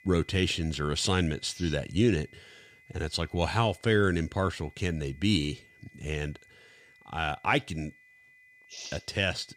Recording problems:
high-pitched whine; faint; throughout; 2 kHz, 25 dB below the speech

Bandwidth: 14.5 kHz